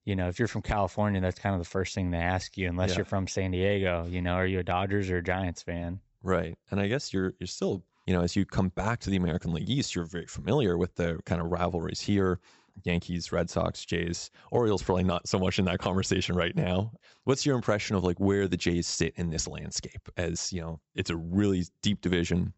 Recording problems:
high frequencies cut off; noticeable; nothing above 8 kHz

